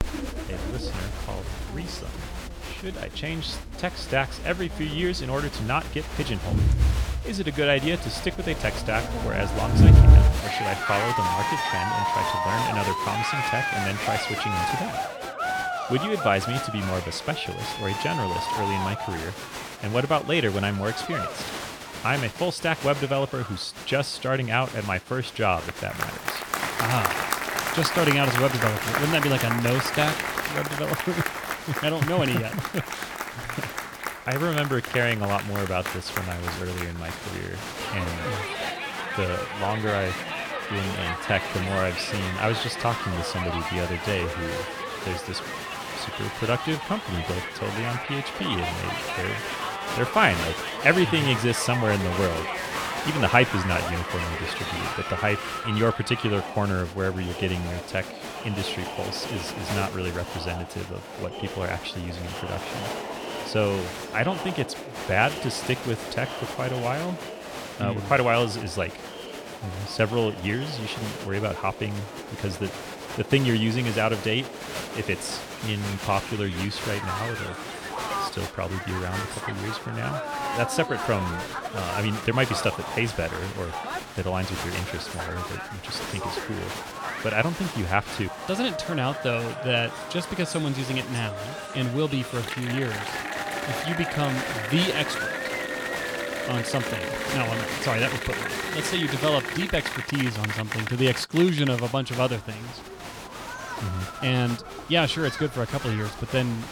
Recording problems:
crowd noise; loud; throughout; 2 dB below the speech

